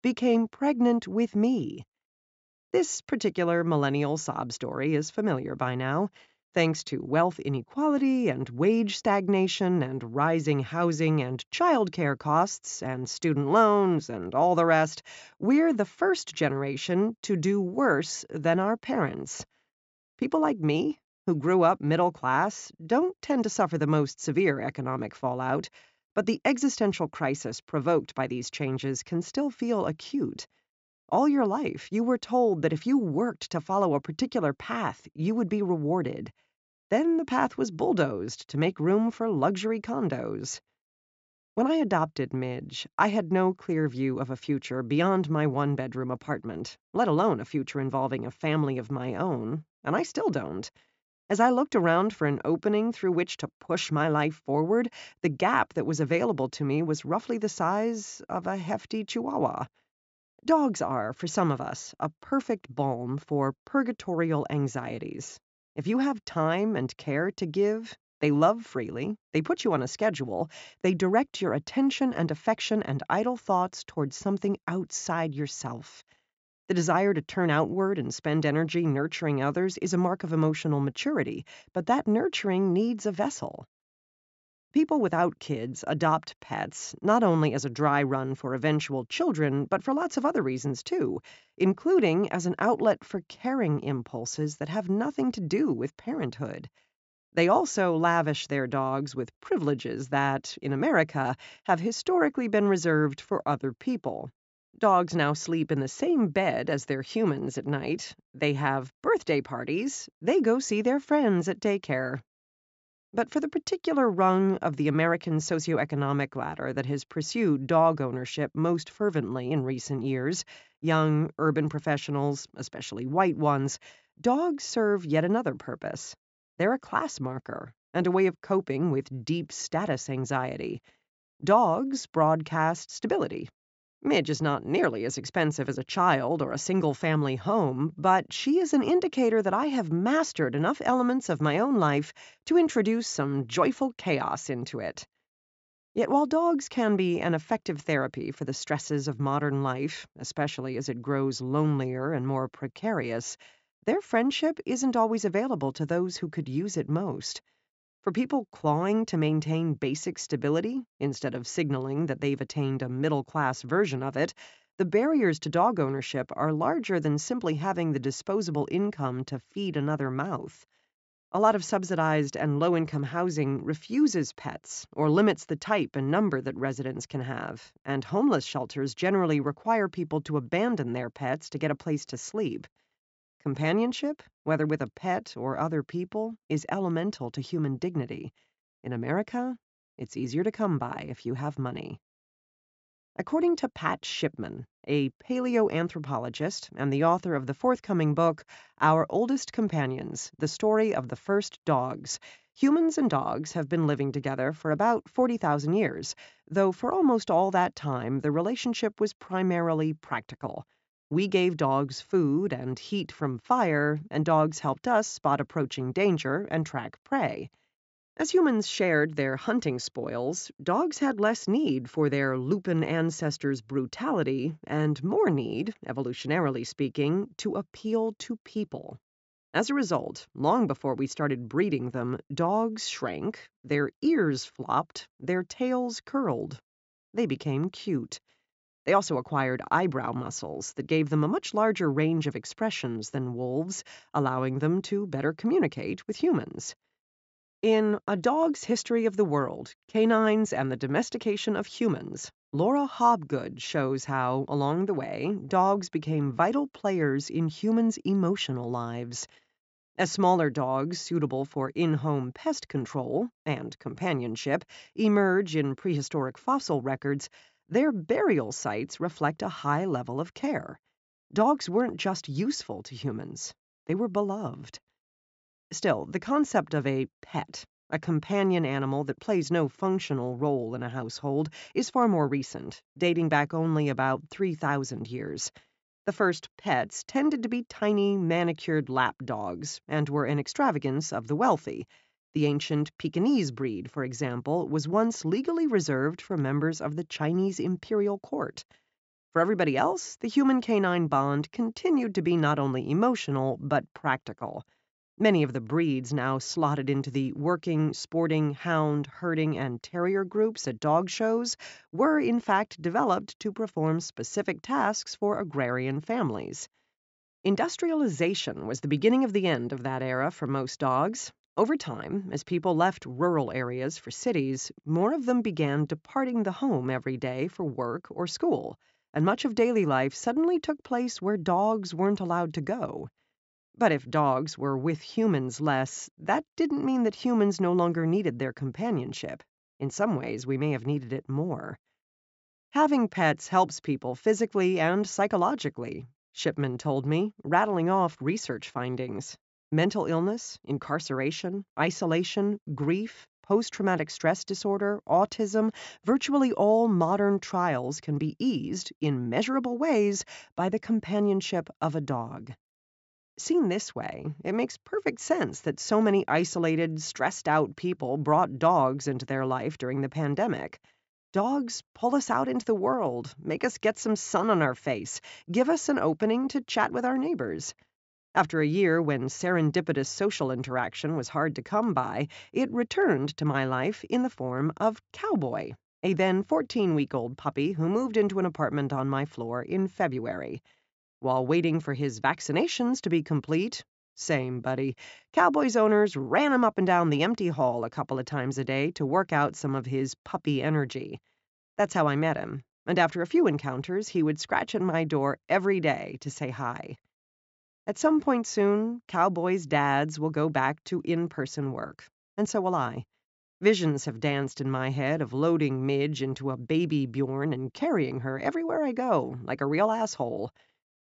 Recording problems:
high frequencies cut off; noticeable; nothing above 8 kHz

